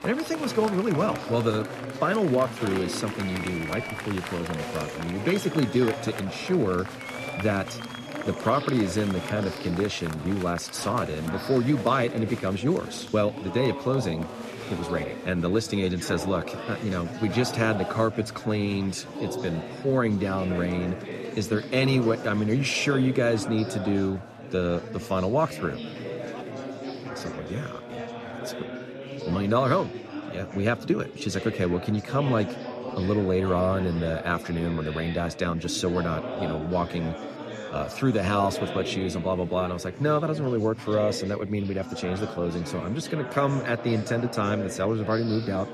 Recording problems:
chatter from many people; loud; throughout; 8 dB below the speech

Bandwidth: 13.5 kHz